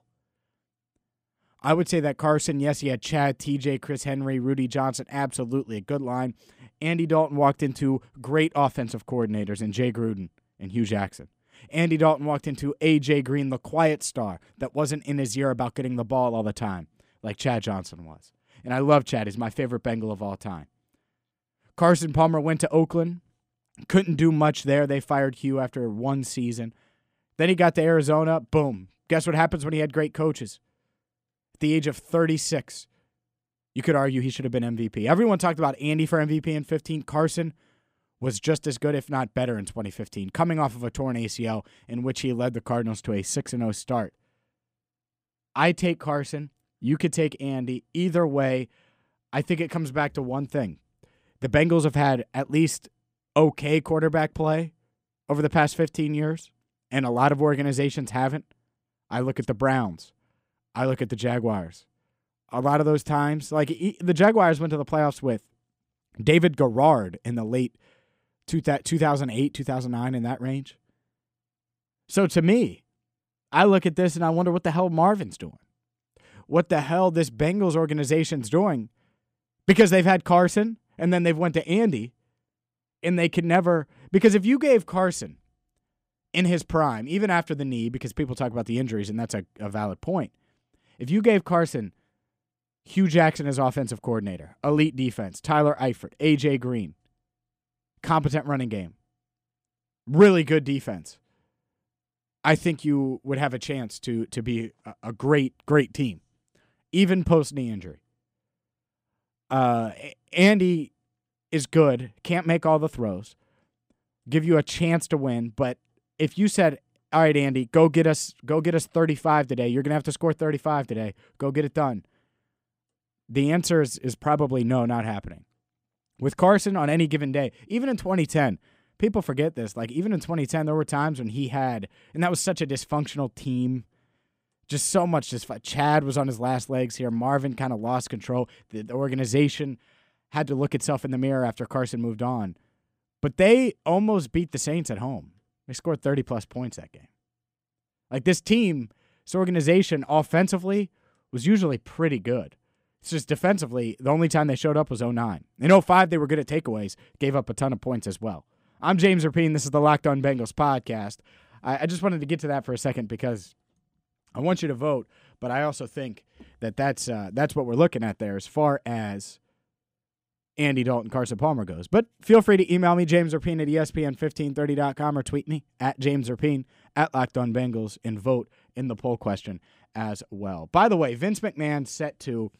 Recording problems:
none

